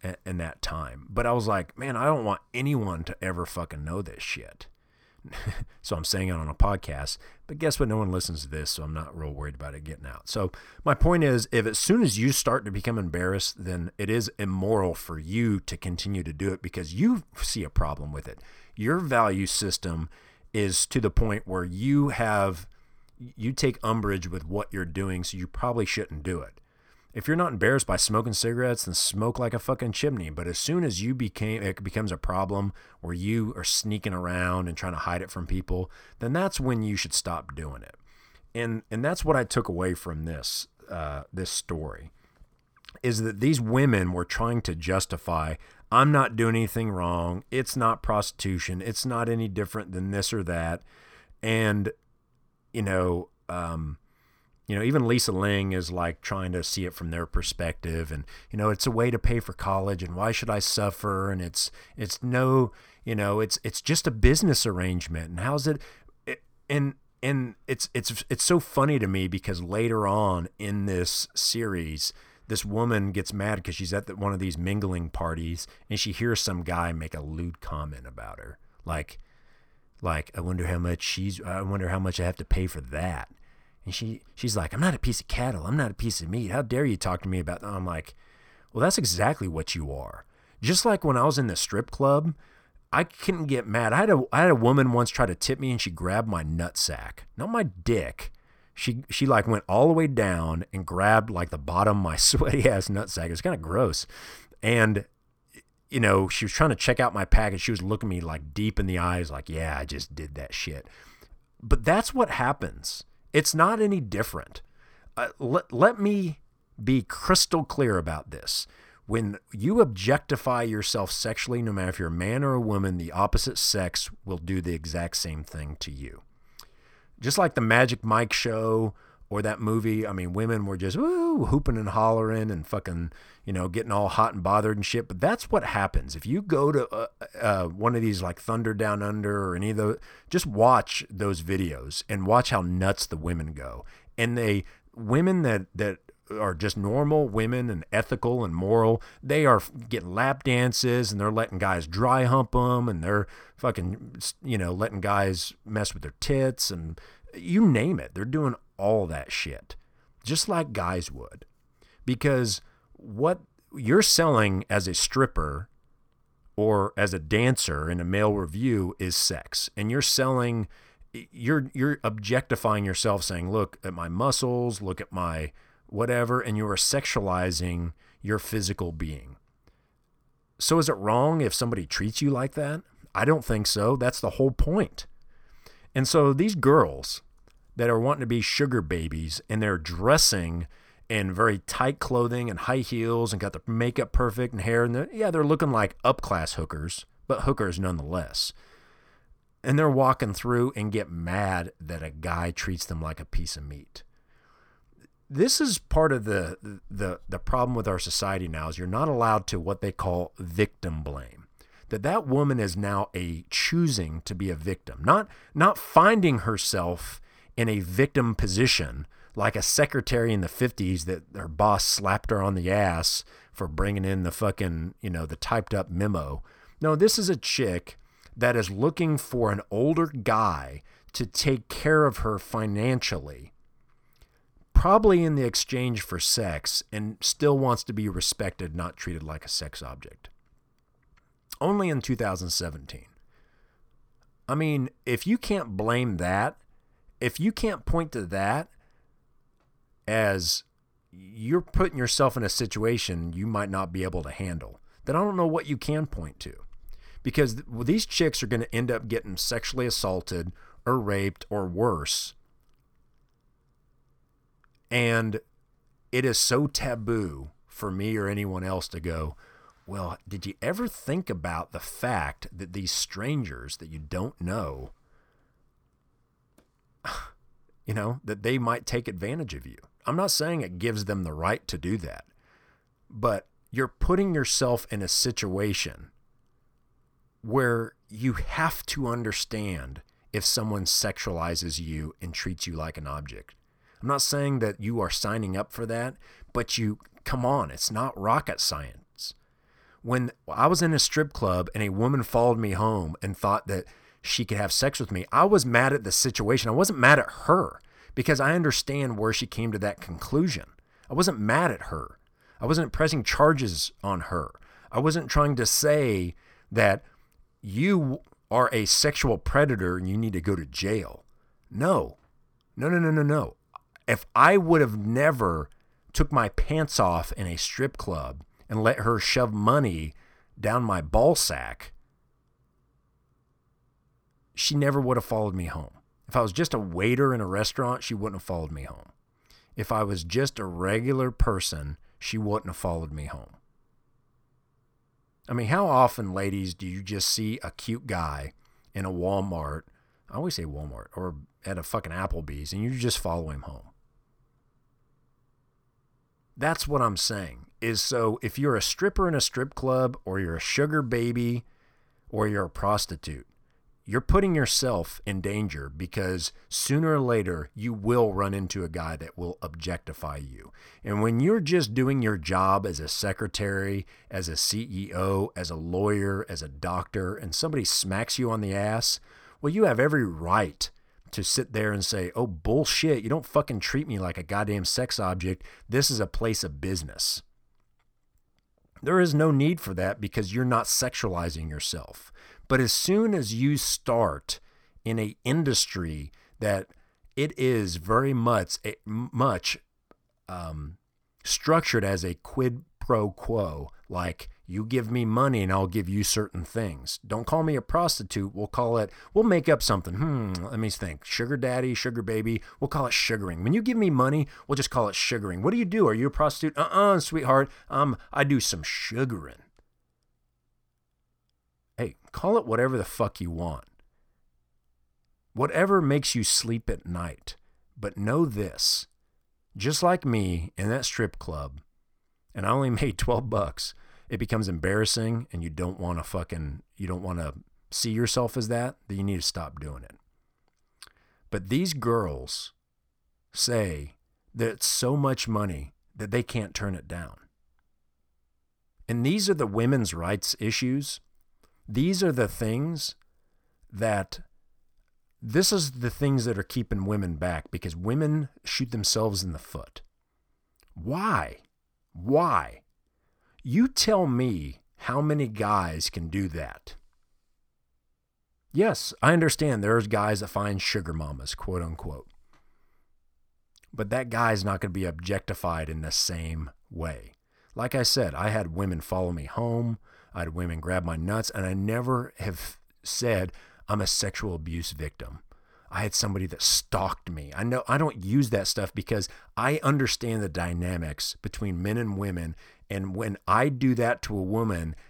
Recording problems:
uneven, jittery; strongly; from 41 s to 7:46

